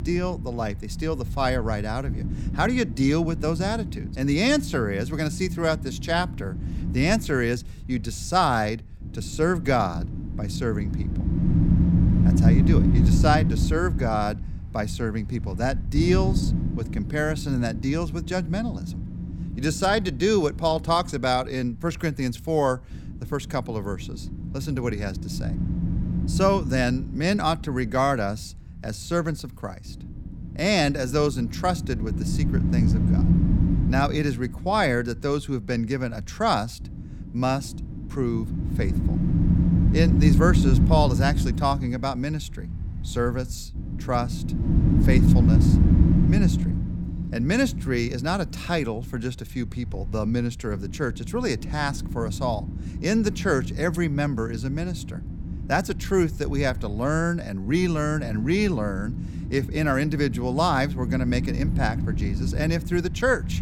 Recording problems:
wind noise on the microphone; heavy; 9 dB below the speech

